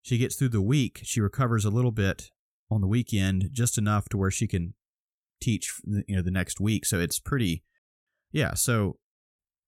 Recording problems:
none

